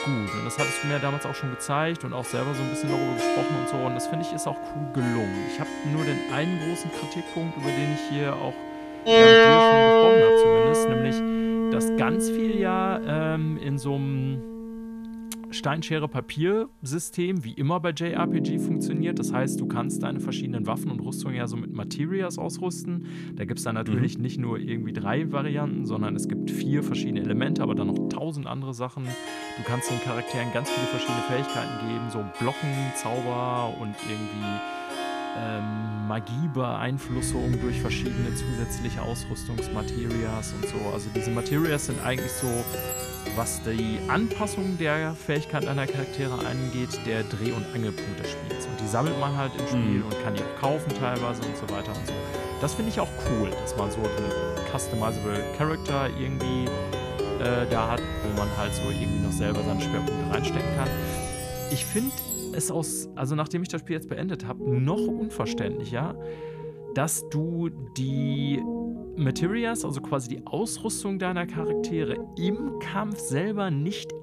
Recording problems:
background music; very loud; throughout; 2 dB above the speech

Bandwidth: 14.5 kHz